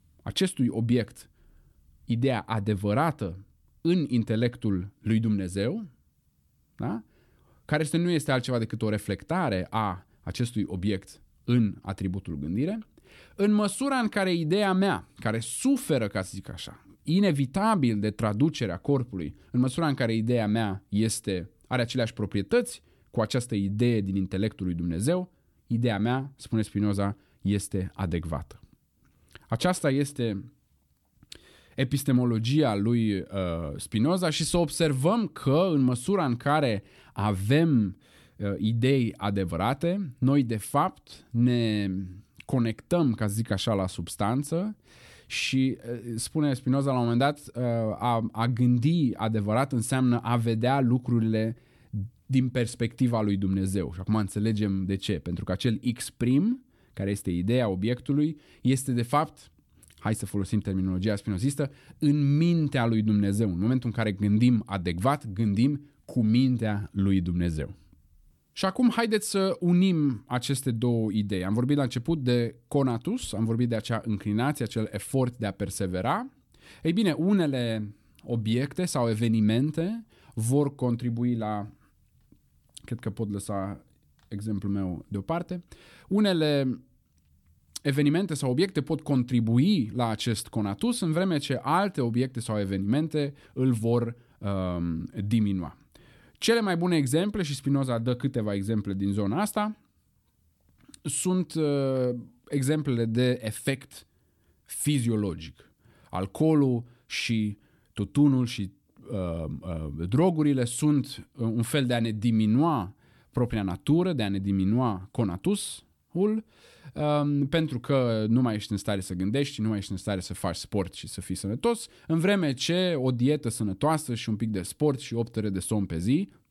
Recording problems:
none

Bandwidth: 18 kHz